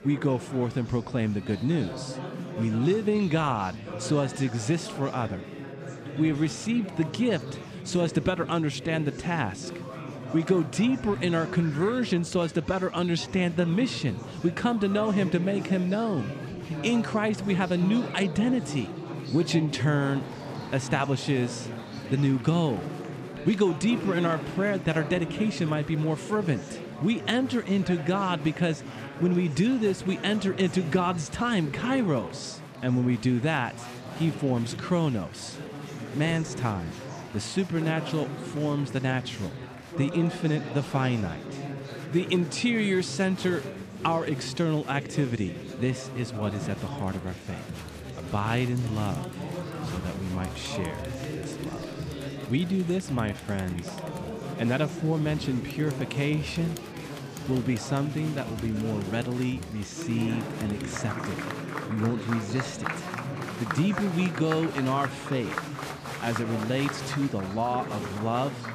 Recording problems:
chatter from many people; loud; throughout; 9 dB below the speech

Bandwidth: 14.5 kHz